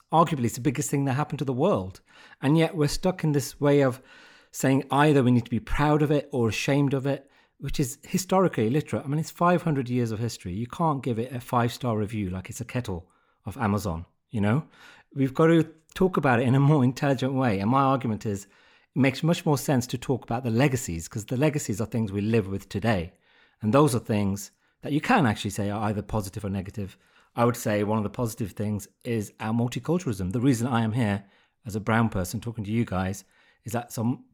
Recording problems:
none

